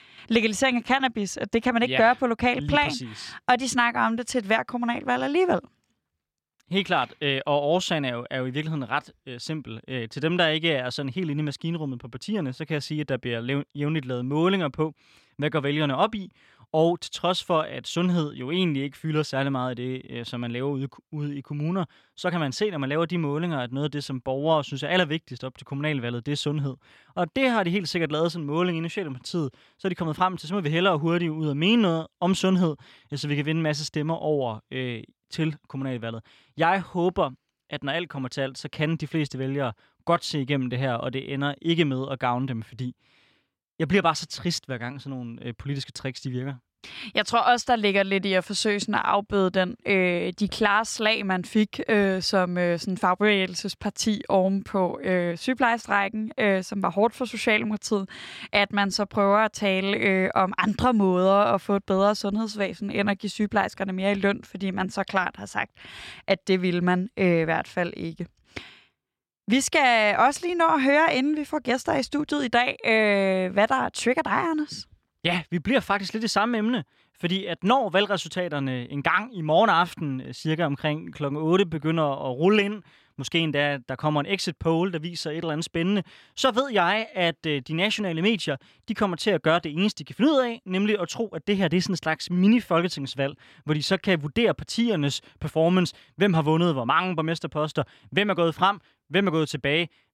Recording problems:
none

